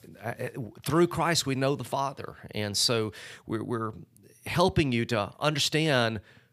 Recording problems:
none

